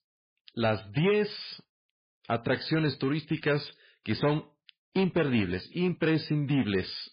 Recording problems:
garbled, watery; badly; nothing above 5 kHz
distortion; slight; 6% of the sound clipped

